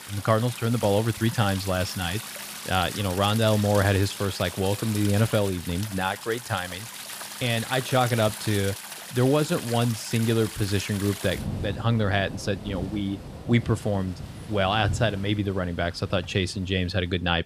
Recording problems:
rain or running water; noticeable; throughout; 10 dB below the speech

